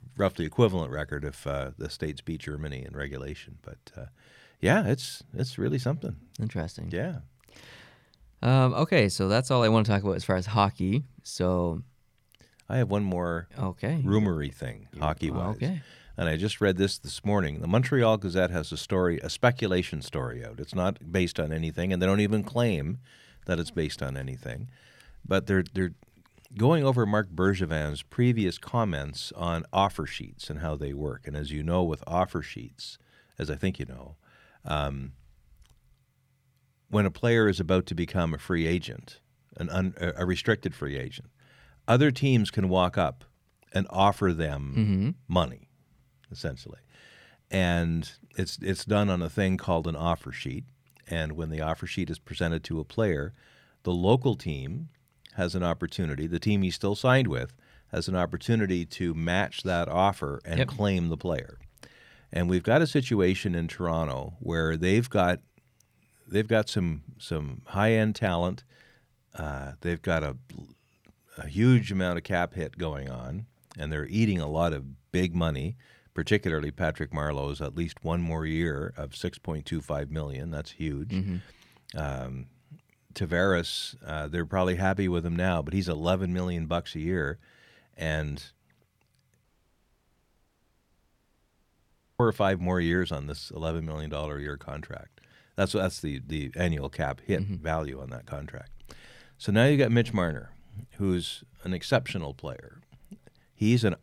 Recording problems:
audio cutting out; at 1:29 for 3 s

